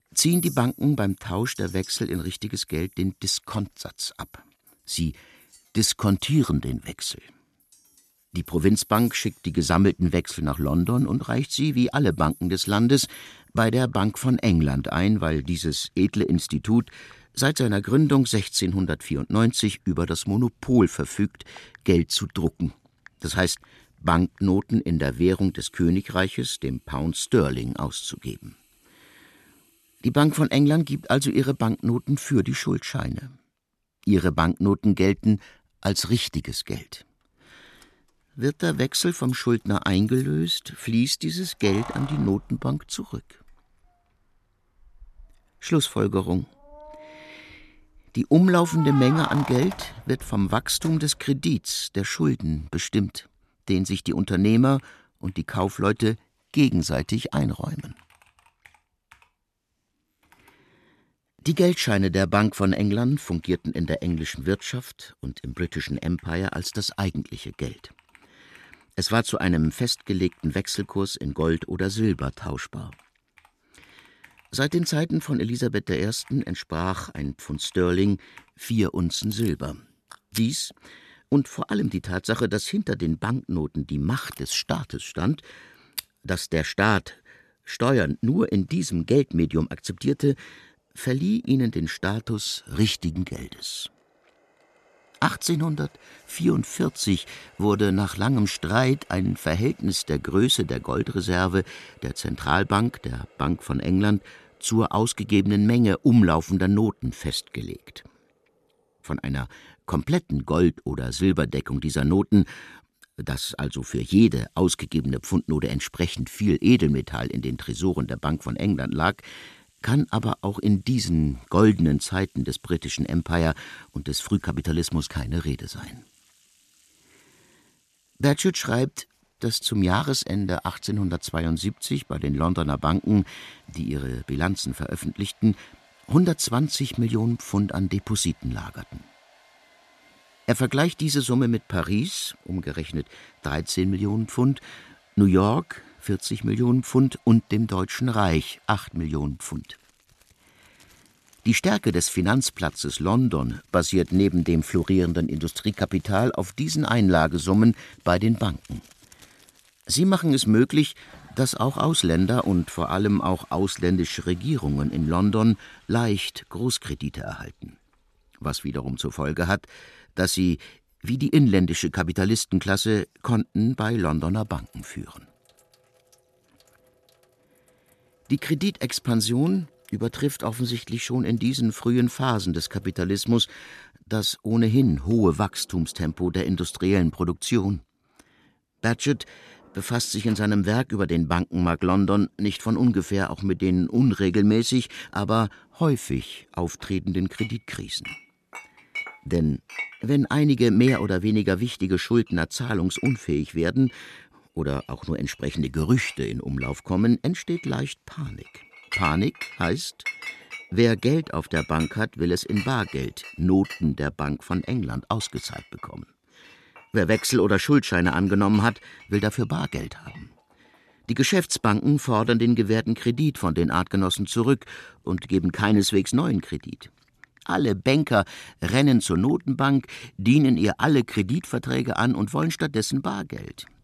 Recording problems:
household noises; noticeable; throughout; 20 dB below the speech

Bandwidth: 13.5 kHz